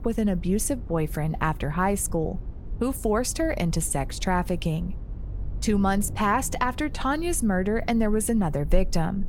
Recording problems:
low rumble; faint; throughout; 25 dB below the speech

